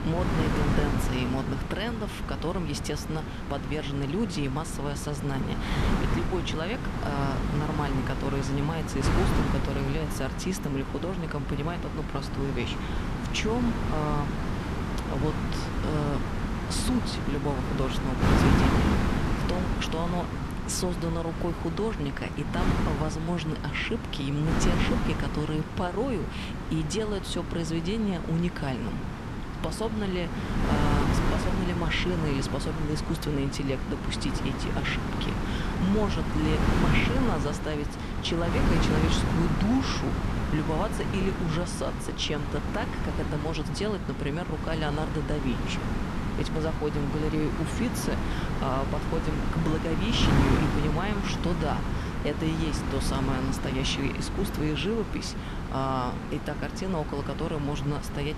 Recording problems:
wind noise on the microphone; heavy; 1 dB below the speech

